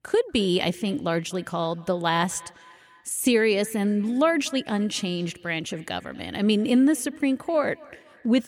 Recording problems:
echo of what is said; faint; throughout; 240 ms later, 25 dB below the speech

